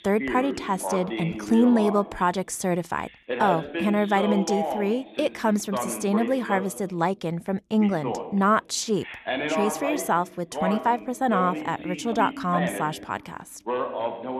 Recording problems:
voice in the background; loud; throughout; 6 dB below the speech

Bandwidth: 13.5 kHz